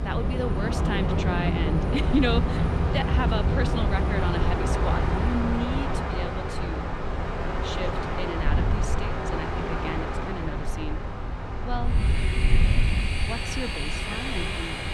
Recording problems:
train or aircraft noise; very loud; throughout; 4 dB above the speech
wind noise on the microphone; occasional gusts; 15 dB below the speech

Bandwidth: 15.5 kHz